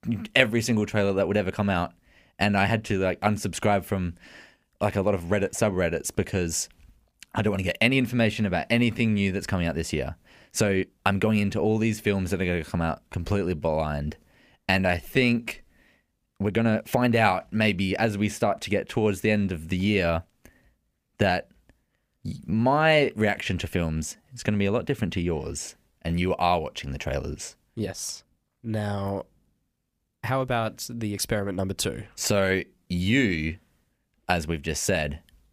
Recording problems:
uneven, jittery; strongly; from 1 to 33 s

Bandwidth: 15 kHz